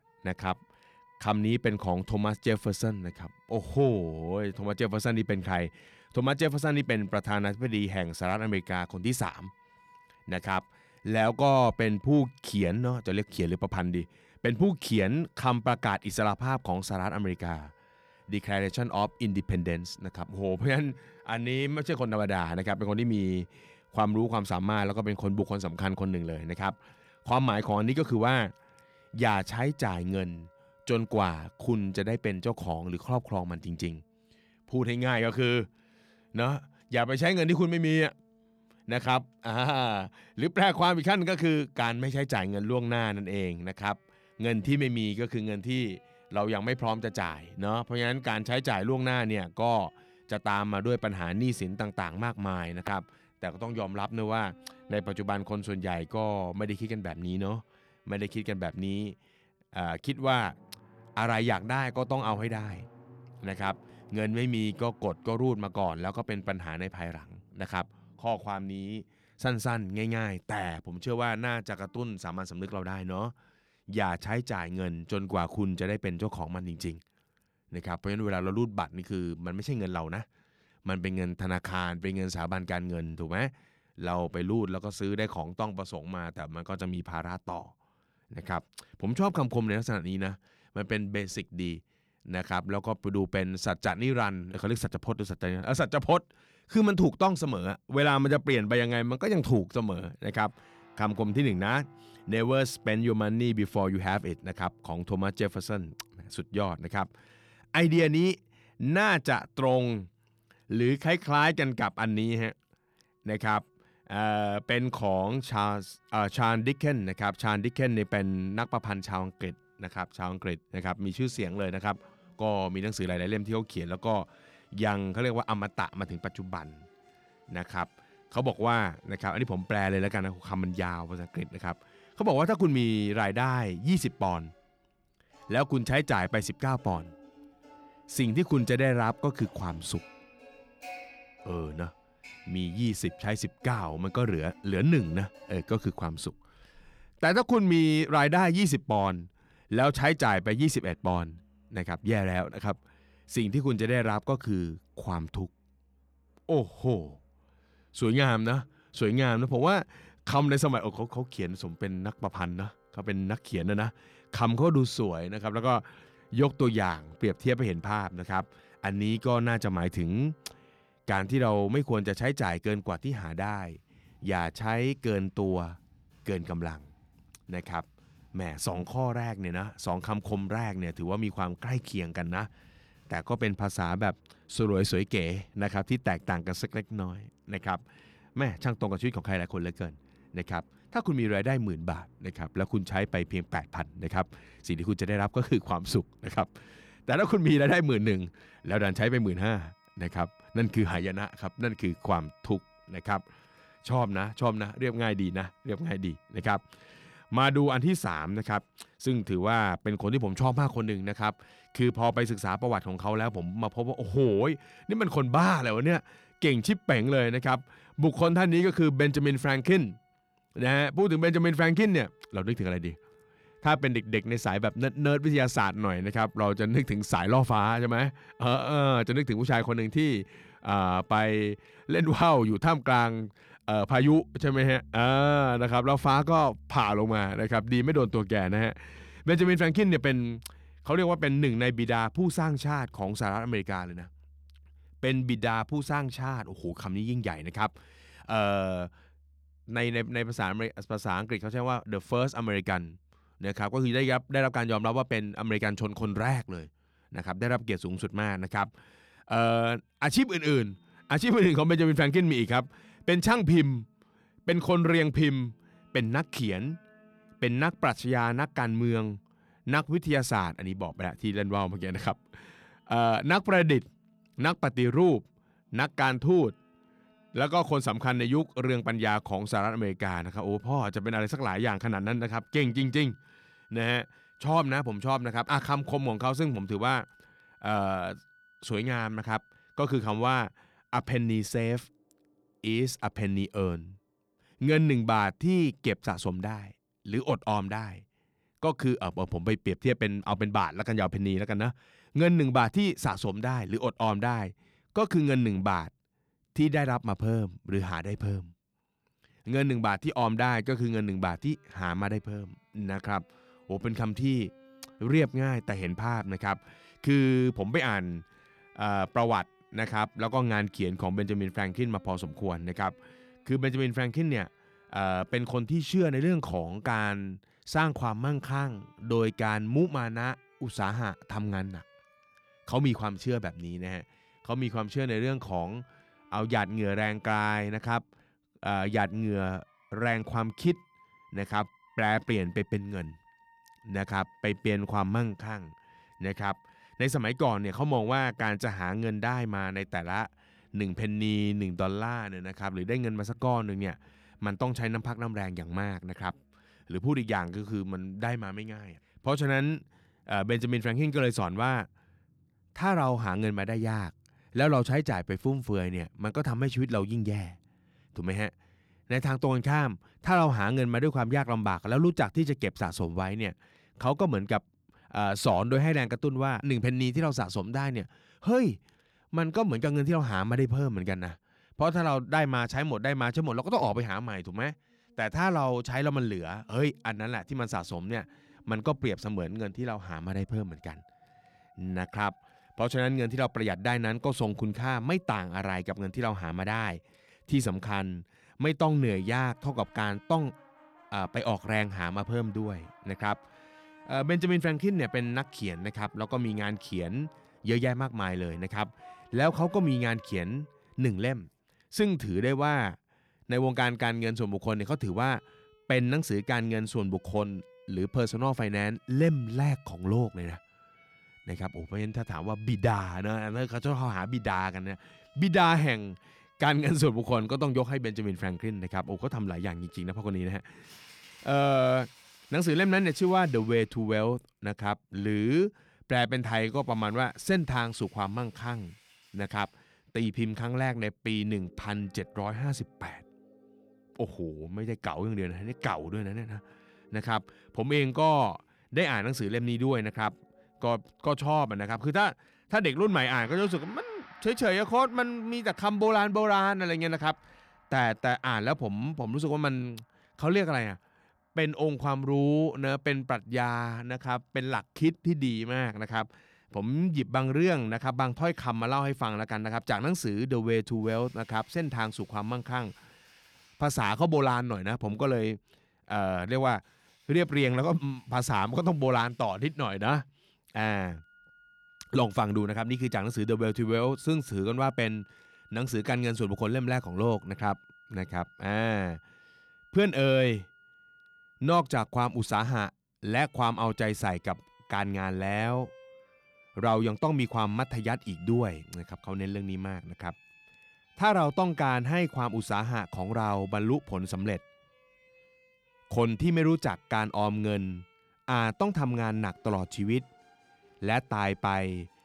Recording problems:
background music; faint; throughout; 30 dB below the speech

